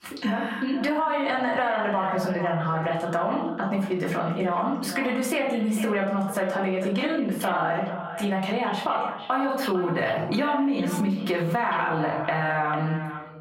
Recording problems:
echo of what is said; strong; throughout; 450 ms later, 10 dB below the speech
off-mic speech; far
squashed, flat; heavily
room echo; slight; dies away in 0.5 s
muffled; very slightly; fading above 3 kHz

